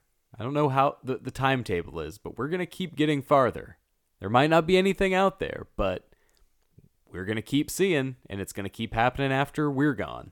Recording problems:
none

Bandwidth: 18 kHz